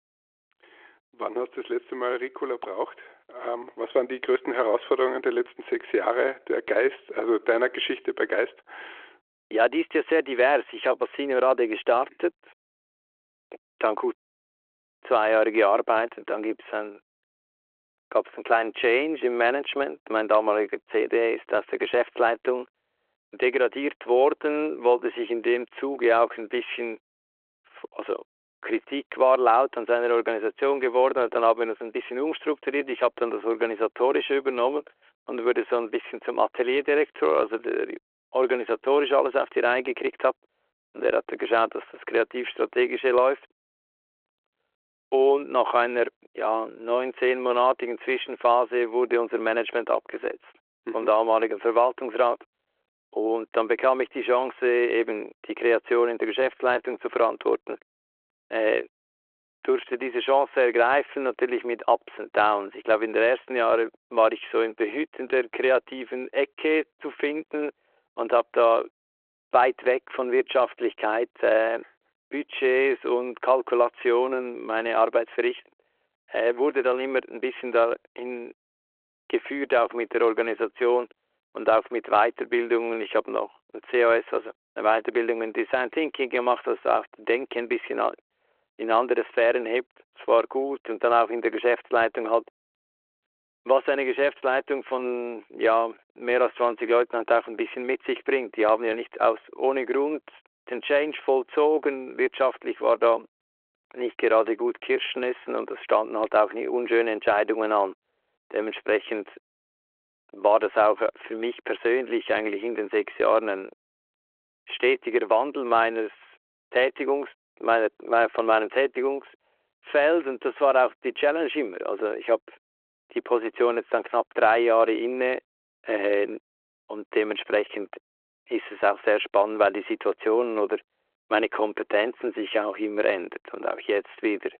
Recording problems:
phone-call audio

